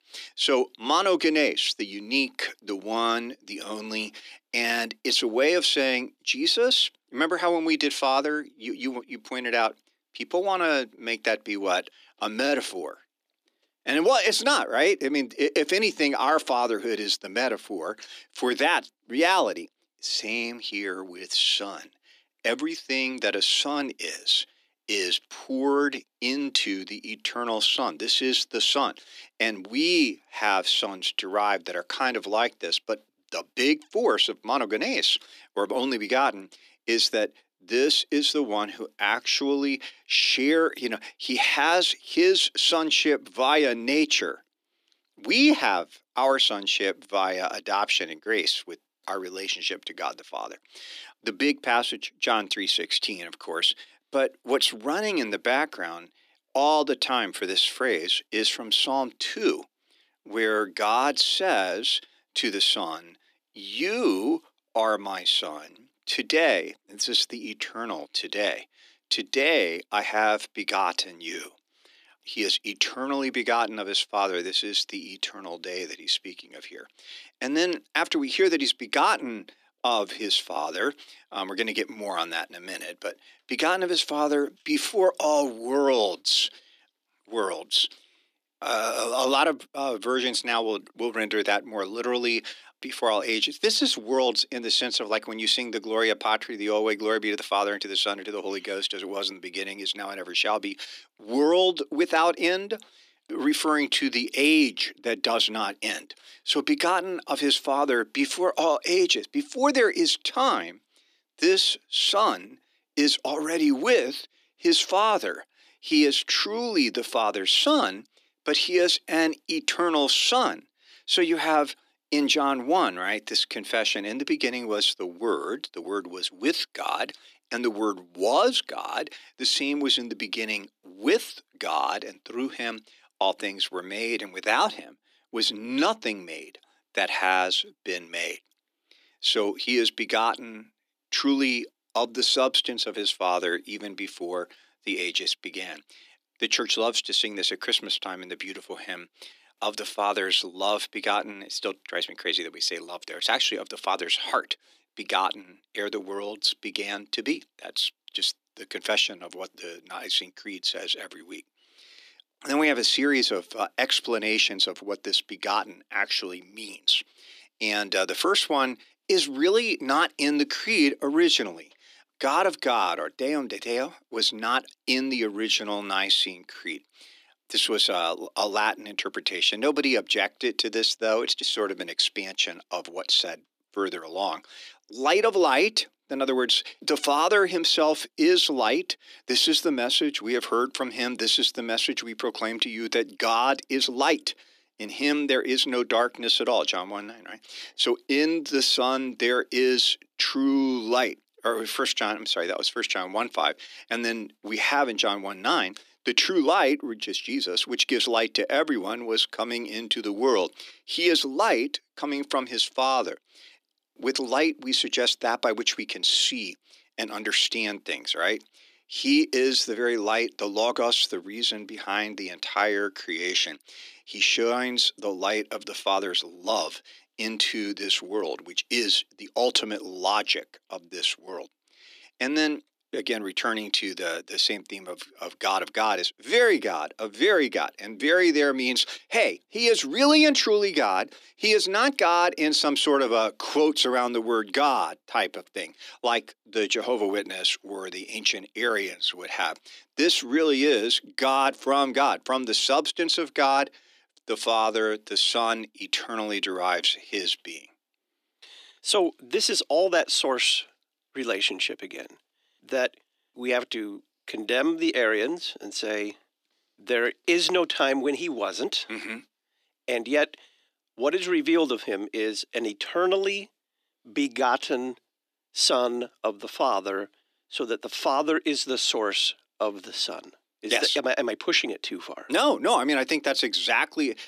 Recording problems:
thin; somewhat; fading below 300 Hz

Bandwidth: 14.5 kHz